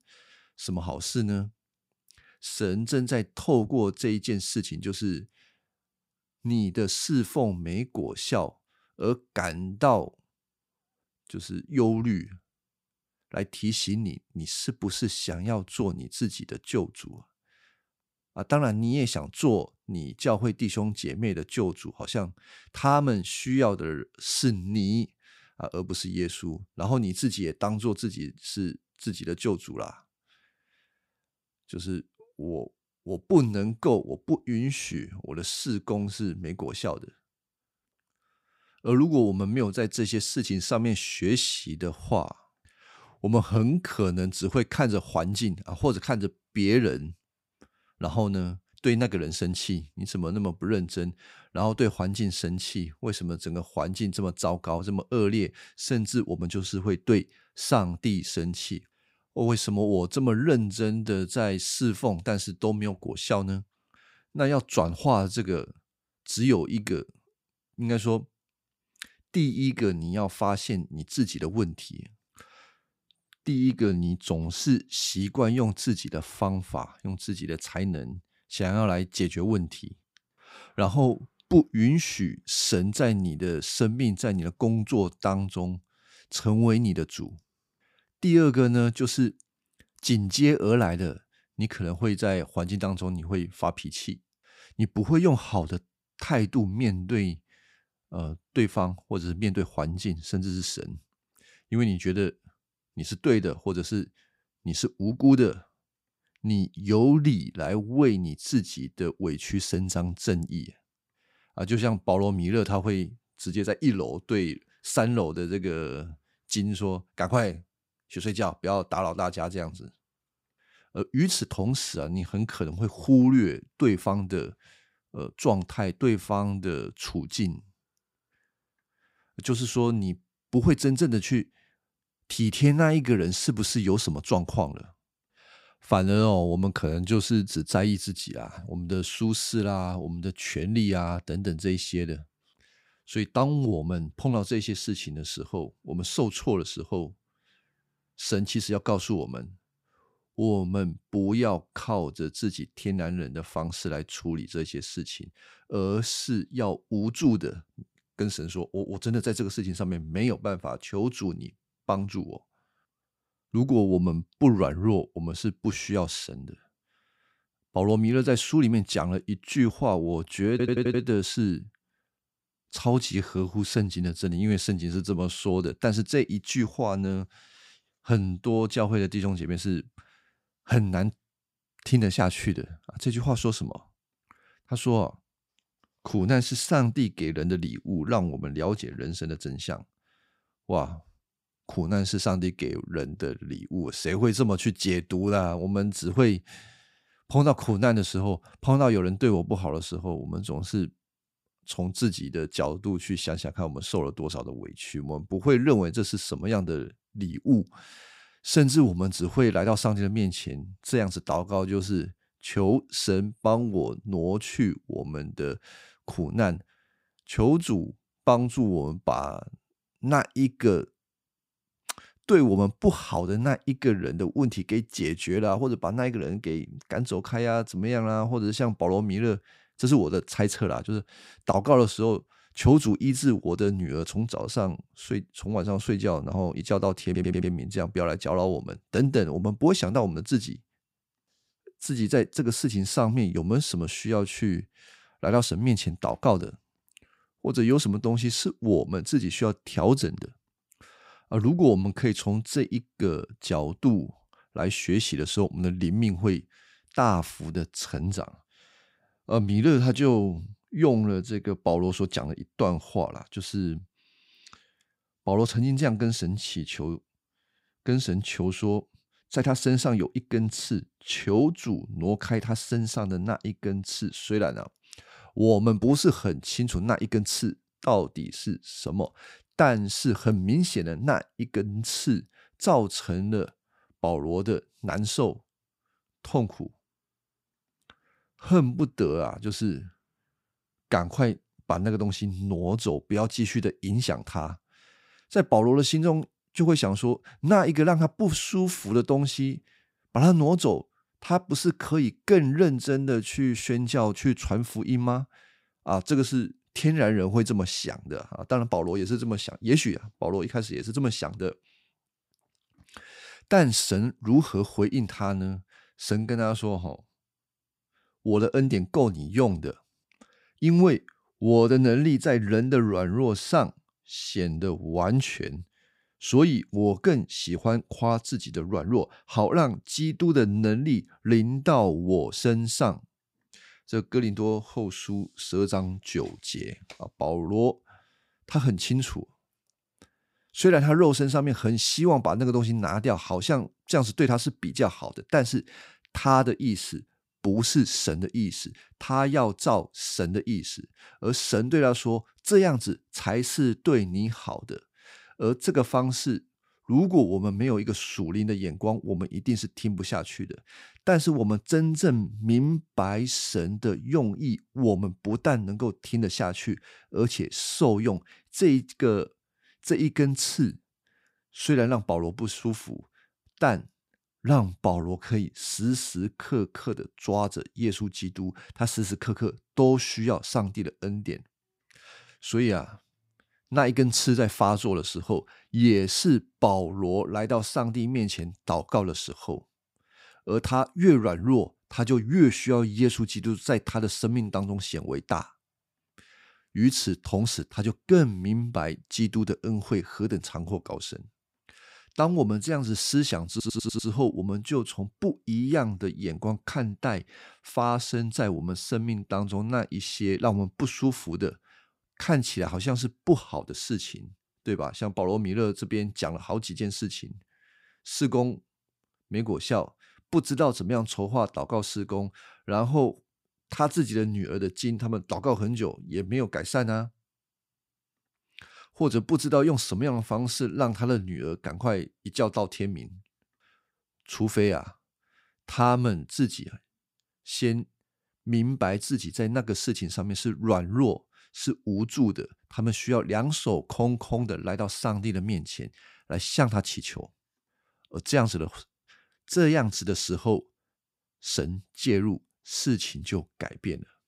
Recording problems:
audio stuttering; at 2:51, at 3:57 and at 6:44

